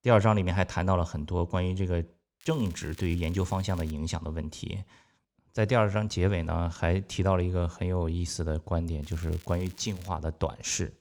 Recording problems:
crackling; faint; from 2.5 to 4 s and from 9 to 10 s; 25 dB below the speech

